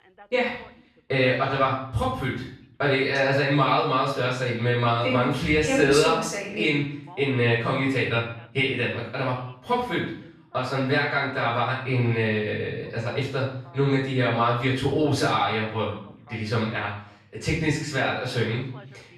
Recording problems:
off-mic speech; far
room echo; noticeable; dies away in 0.5 s
voice in the background; faint; throughout; 30 dB below the speech

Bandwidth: 13.5 kHz